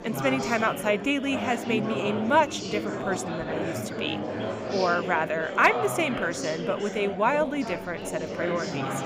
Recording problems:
chatter from many people; loud; throughout; 5 dB below the speech

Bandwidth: 15.5 kHz